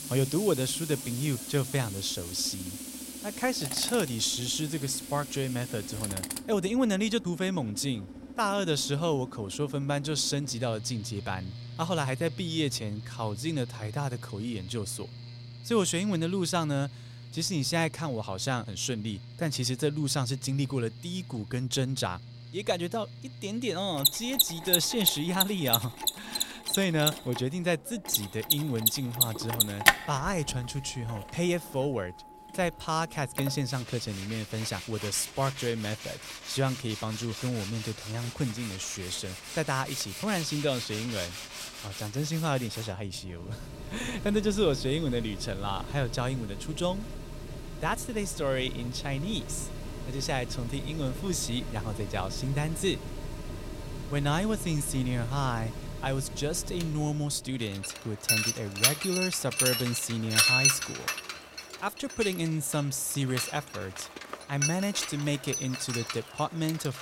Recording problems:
machinery noise; loud; throughout; 2 dB below the speech

